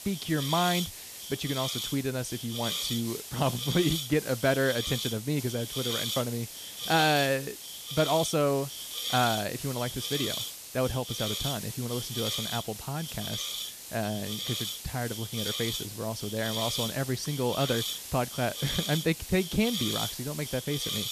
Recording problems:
hiss; loud; throughout; 3 dB below the speech

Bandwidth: 14.5 kHz